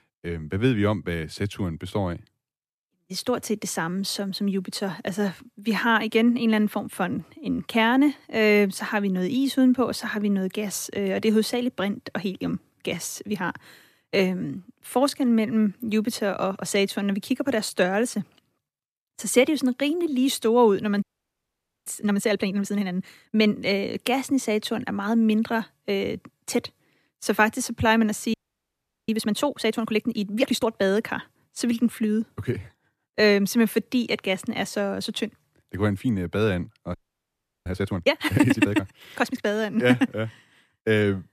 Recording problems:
audio freezing; at 21 s for 1 s, at 28 s for 0.5 s and at 37 s for 0.5 s

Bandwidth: 14.5 kHz